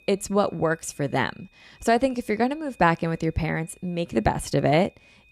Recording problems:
high-pitched whine; faint; throughout; 2.5 kHz, 30 dB below the speech

